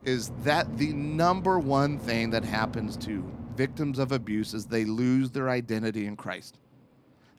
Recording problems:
train or aircraft noise; noticeable; throughout; 10 dB below the speech

